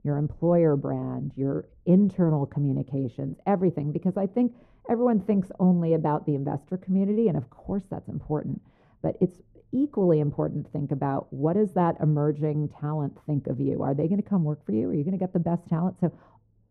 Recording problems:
muffled; very; fading above 1.5 kHz

